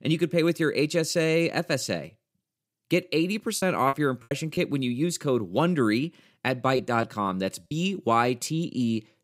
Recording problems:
choppy; very; from 3.5 to 4.5 s and at 7 s; 11% of the speech affected

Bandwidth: 15.5 kHz